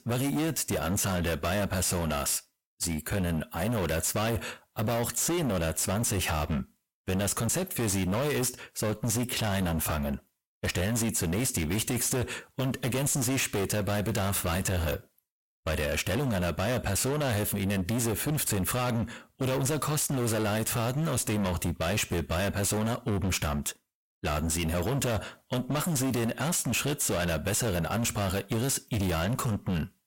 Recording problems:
distortion; heavy; 32% of the sound clipped

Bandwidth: 16.5 kHz